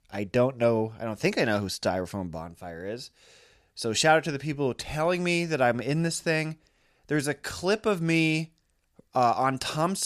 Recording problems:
abrupt cut into speech; at the end

